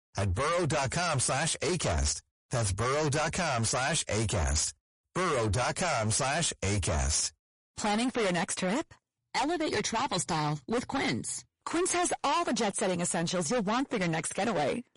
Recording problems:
distortion; heavy; 26% of the sound clipped
garbled, watery; slightly; nothing above 10.5 kHz

